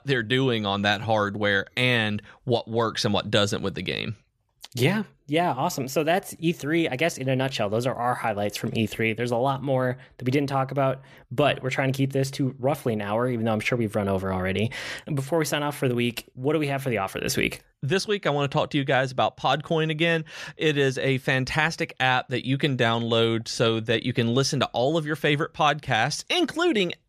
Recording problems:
none

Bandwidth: 14.5 kHz